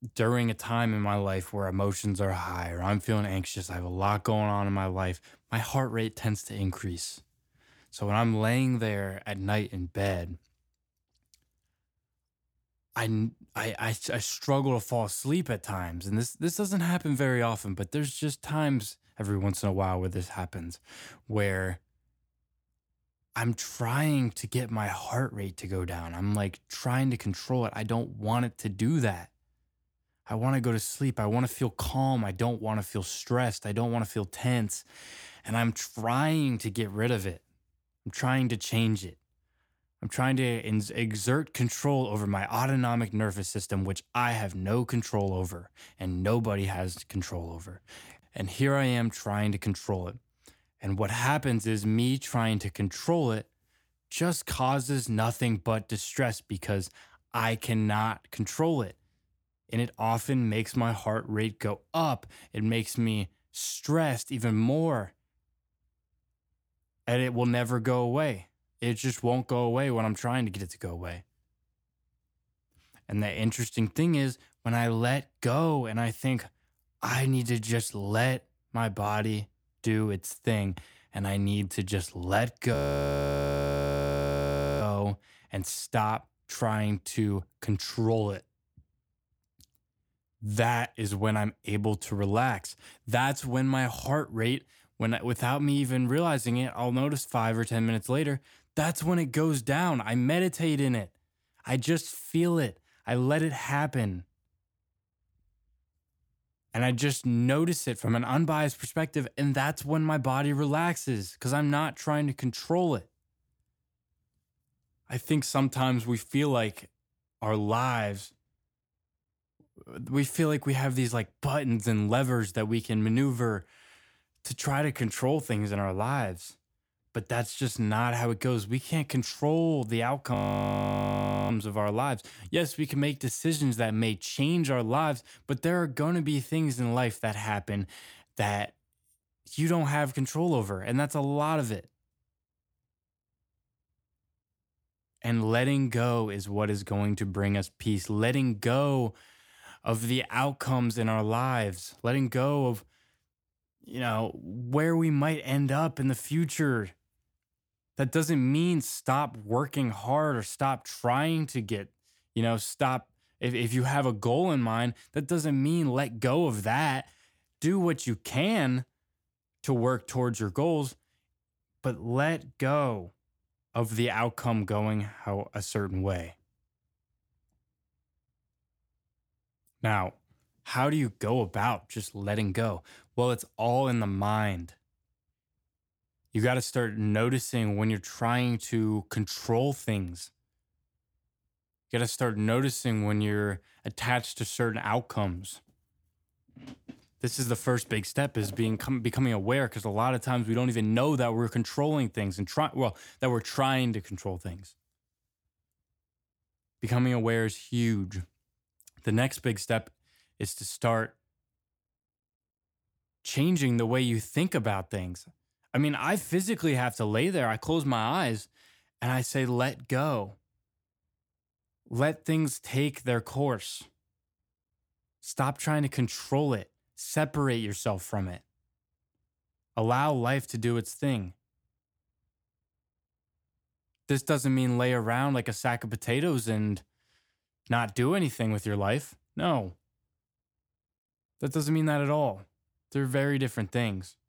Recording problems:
audio freezing; at 1:23 for 2 s and at 2:10 for 1 s

